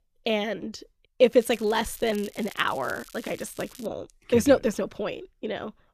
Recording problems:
crackling; faint; from 1.5 to 4 s; 20 dB below the speech

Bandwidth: 14.5 kHz